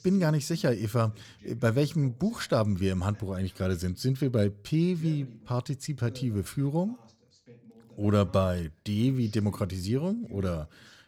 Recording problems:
voice in the background; faint; throughout; 25 dB below the speech

